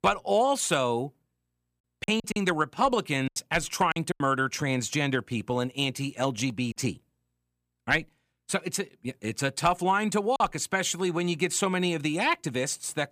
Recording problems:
choppy; very; from 2 to 4 s and at 10 s; 12% of the speech affected

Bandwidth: 15 kHz